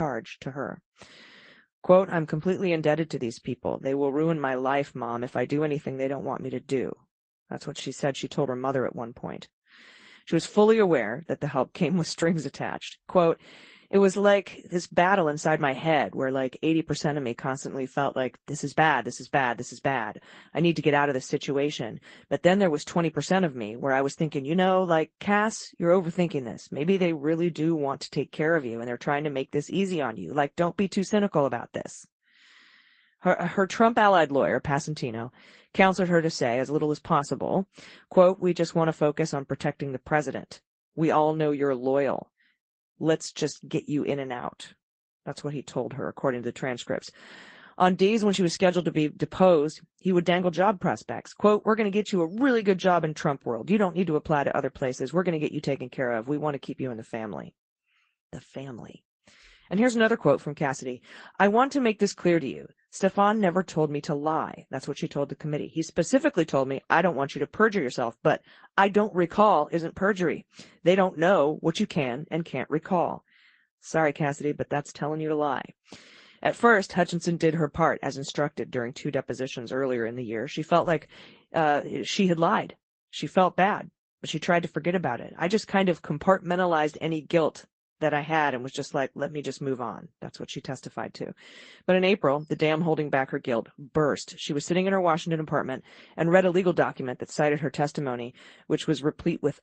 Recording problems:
garbled, watery; slightly; nothing above 8 kHz
abrupt cut into speech; at the start

